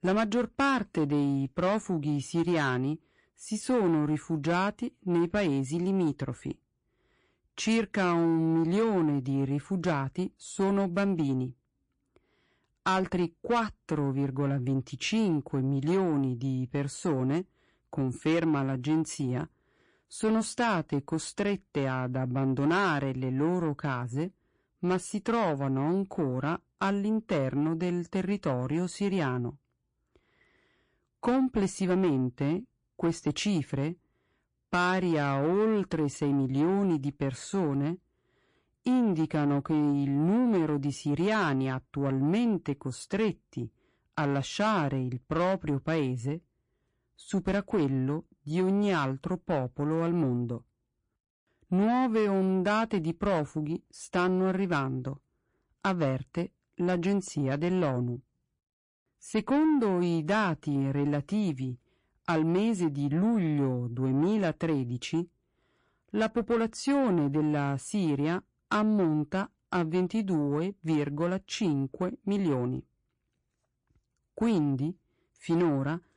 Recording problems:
distortion; slight; 10 dB below the speech
garbled, watery; slightly; nothing above 10 kHz

